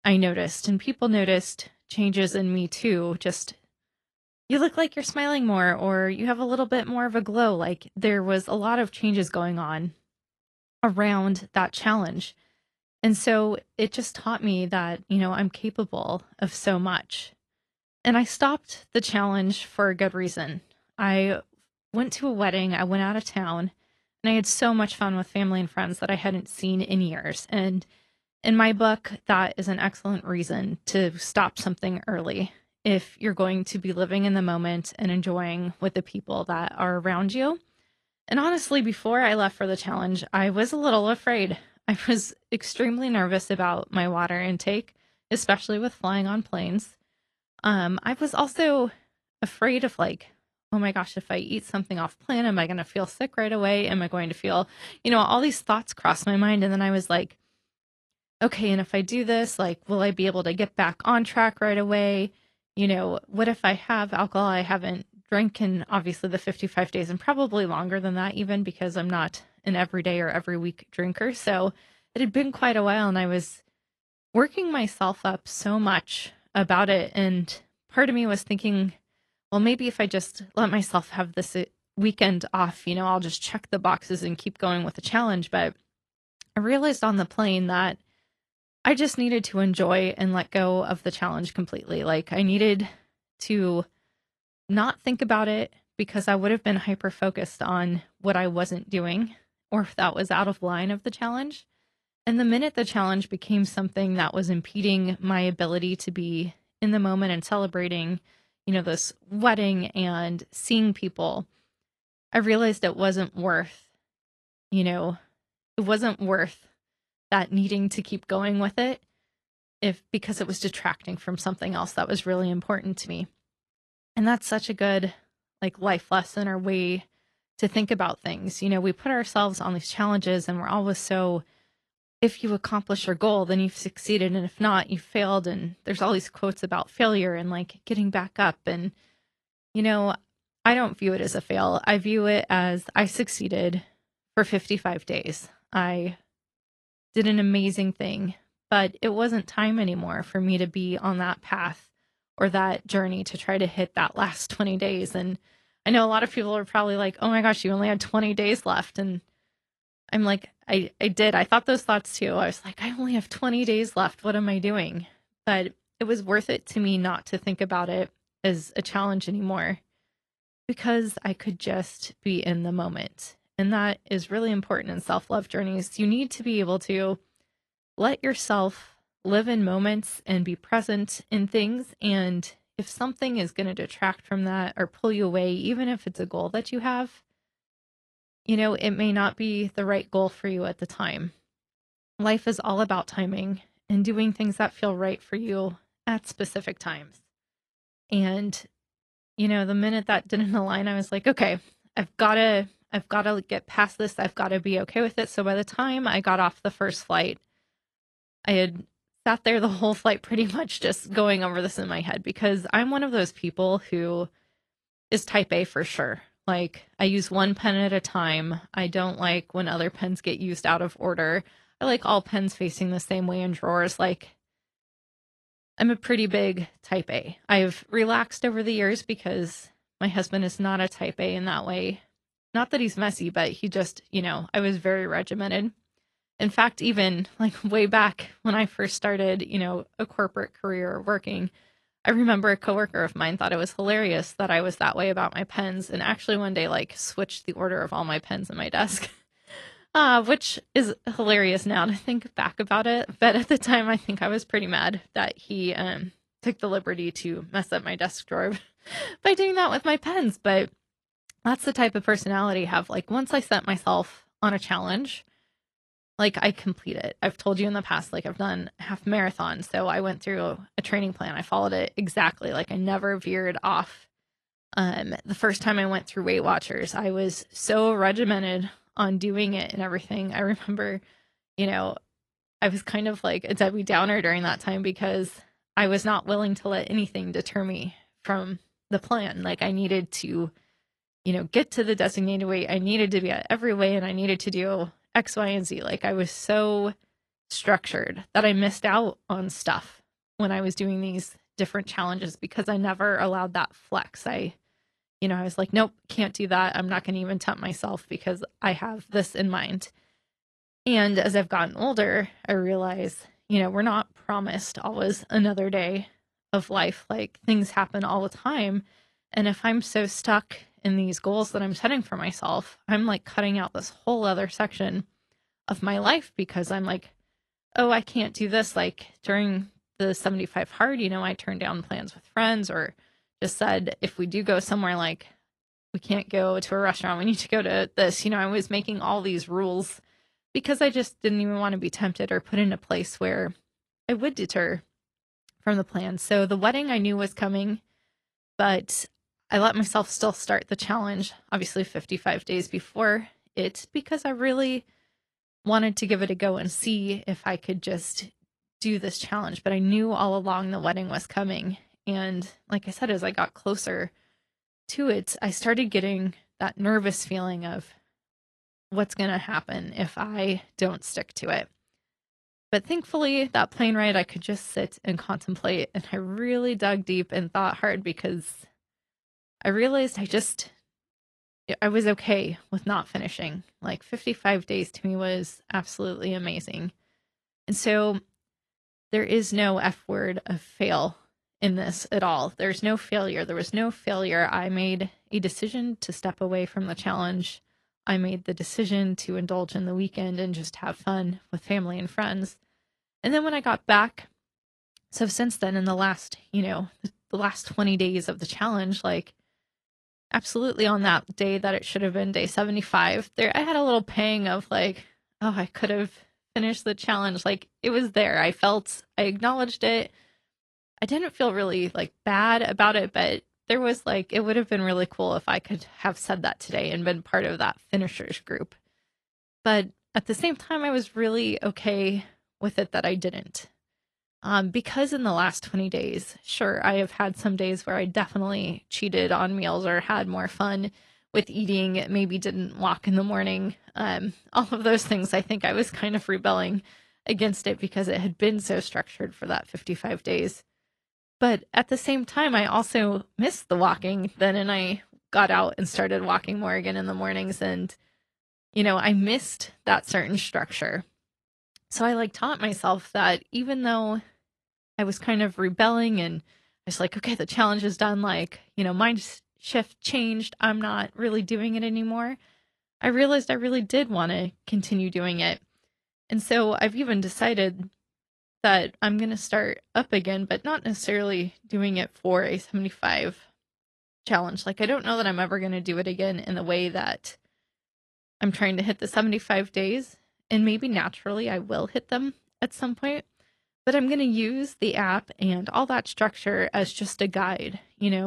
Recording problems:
garbled, watery; slightly; nothing above 11.5 kHz
abrupt cut into speech; at the end

